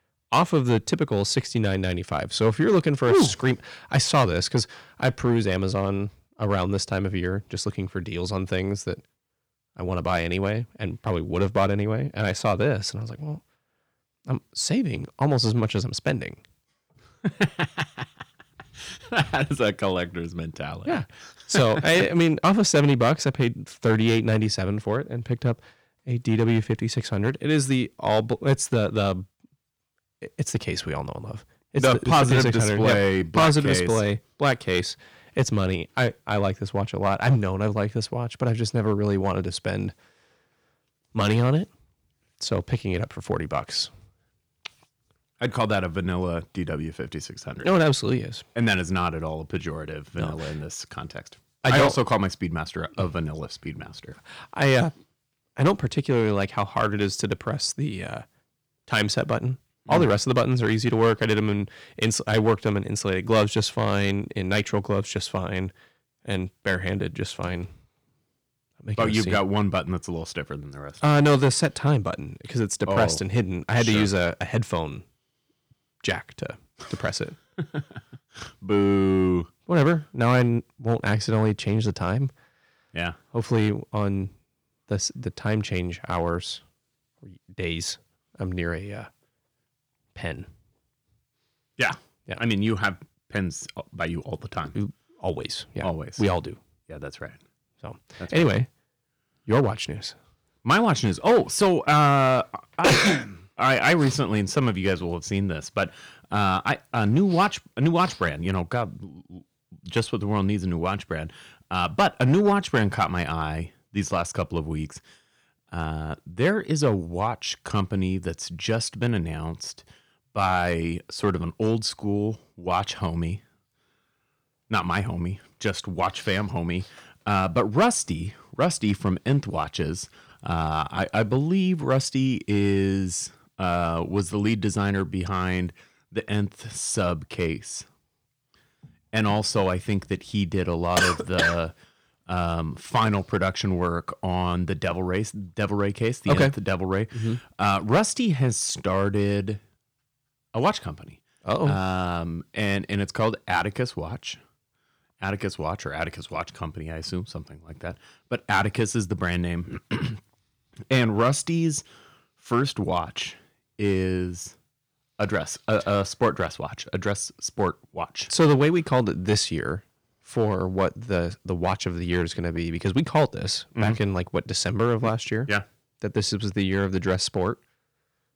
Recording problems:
distortion; slight; 1.9% of the sound clipped

